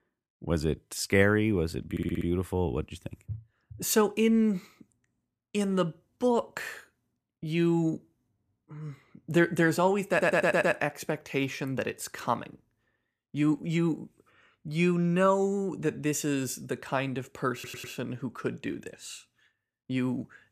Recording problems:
audio stuttering; at 2 s, at 10 s and at 18 s

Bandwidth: 14.5 kHz